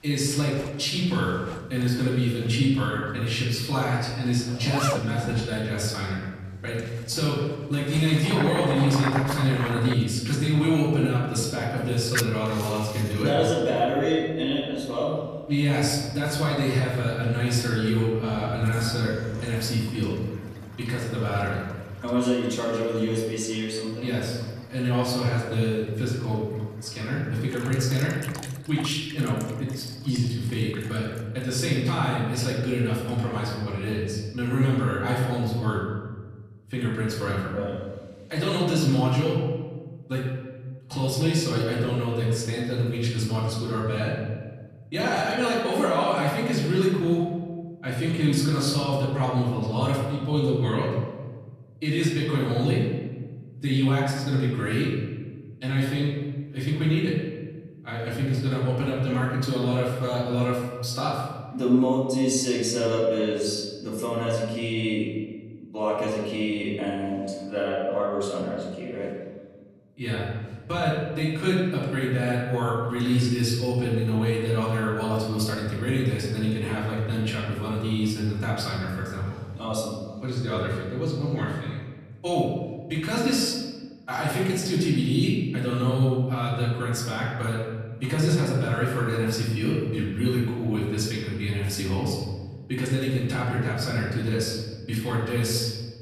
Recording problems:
off-mic speech; far
room echo; noticeable; dies away in 1.3 s
household noises; very faint; until 32 s; 10 dB below the speech

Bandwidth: 14.5 kHz